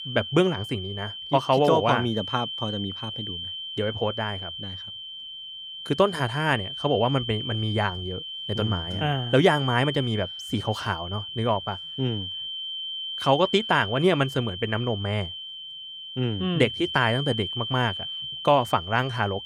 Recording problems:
high-pitched whine; loud; throughout; 3 kHz, 7 dB below the speech

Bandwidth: 18.5 kHz